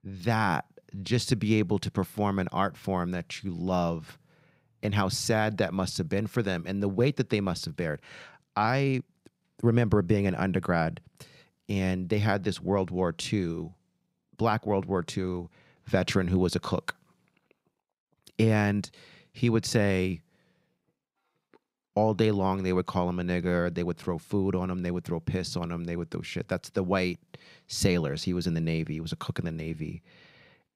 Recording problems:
none

